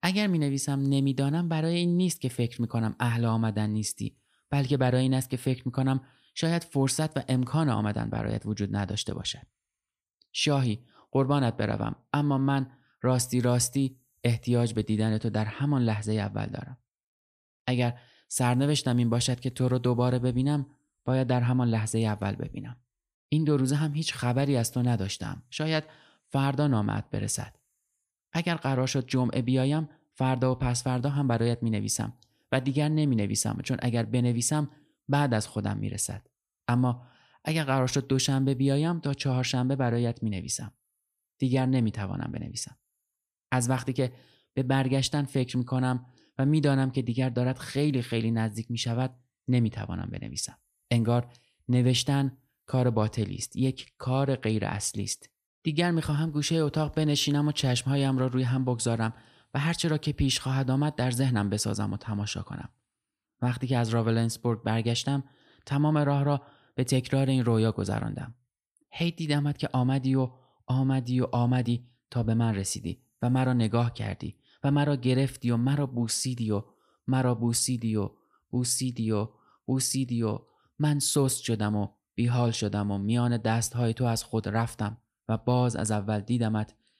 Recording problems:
none

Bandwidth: 14.5 kHz